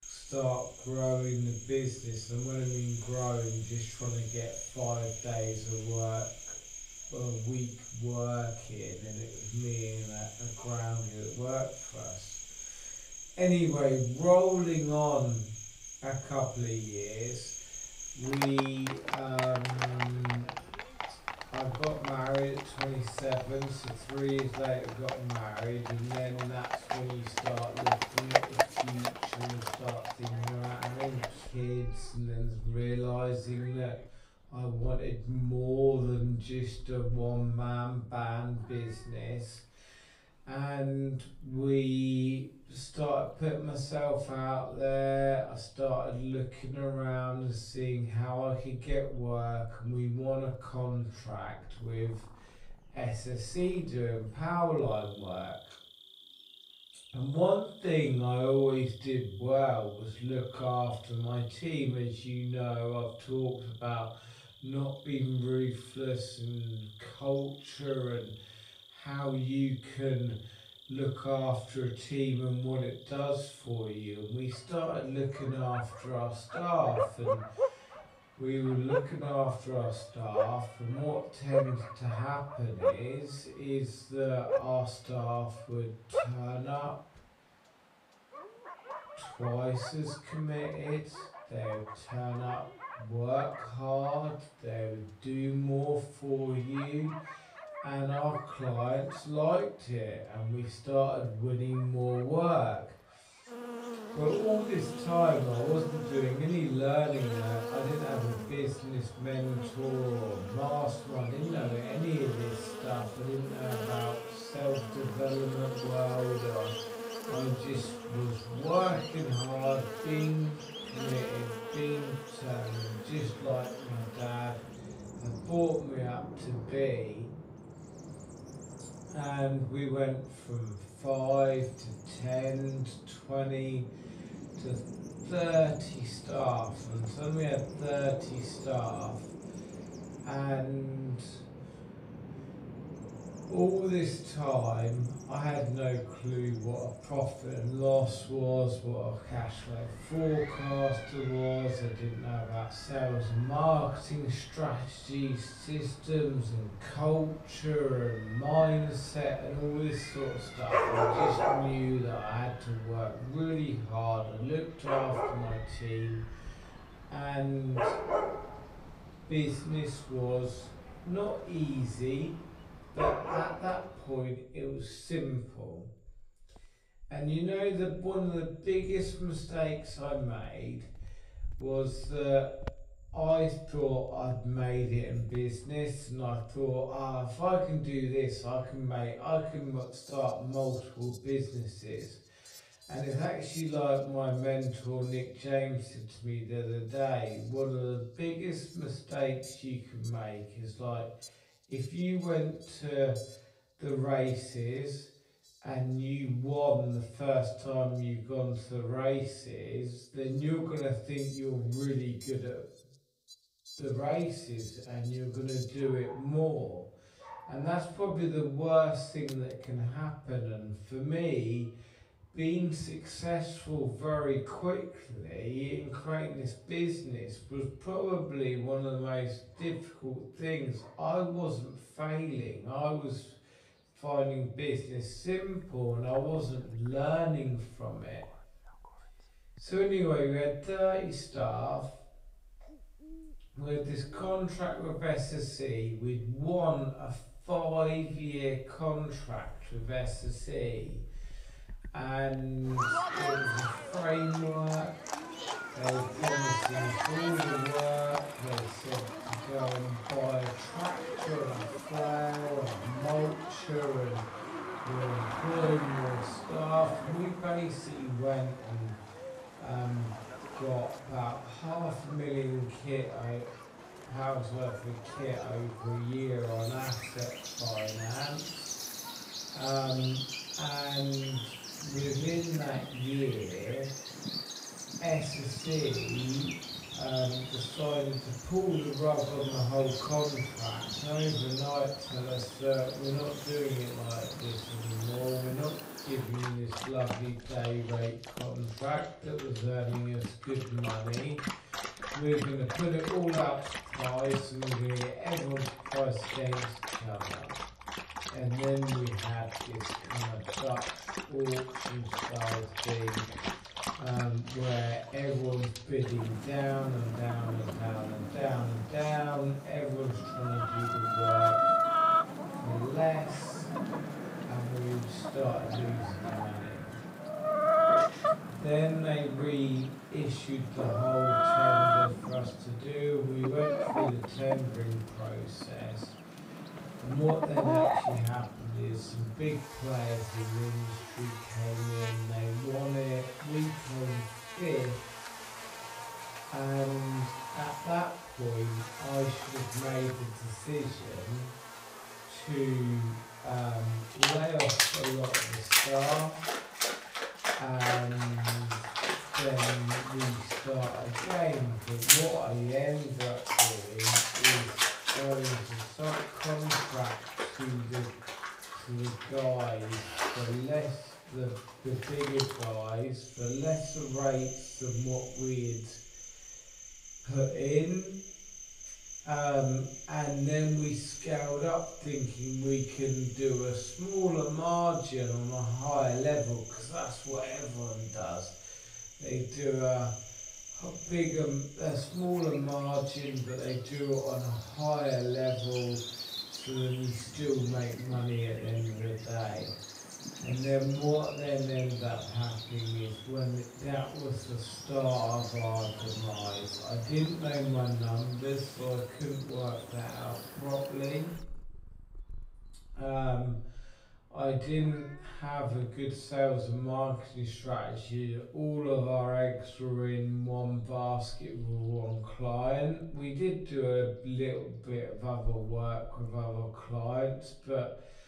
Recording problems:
off-mic speech; far
wrong speed, natural pitch; too slow; 0.5 times normal speed
echo of what is said; faint; from 2:23 on; 90 ms later, 20 dB below the speech
room echo; slight; dies away in 0.4 s
animal sounds; loud; throughout; 3 dB below the speech

